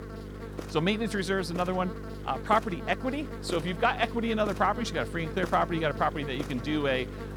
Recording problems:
electrical hum; noticeable; throughout; 50 Hz, 15 dB below the speech

